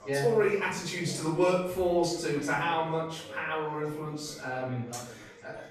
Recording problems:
off-mic speech; far
room echo; noticeable; dies away in 0.6 s
echo of what is said; faint; throughout; 600 ms later, 20 dB below the speech
background chatter; faint; throughout; 4 voices, 20 dB below the speech

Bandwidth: 14 kHz